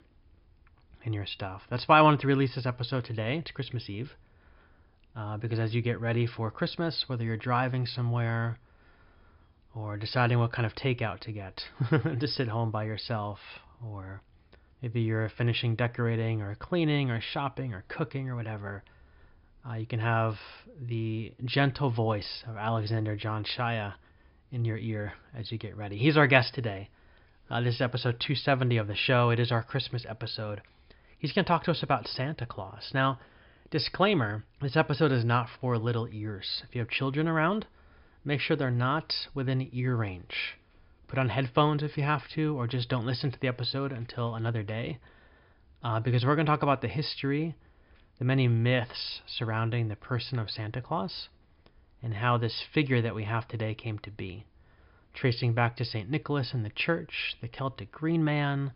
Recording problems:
high frequencies cut off; noticeable; nothing above 5.5 kHz

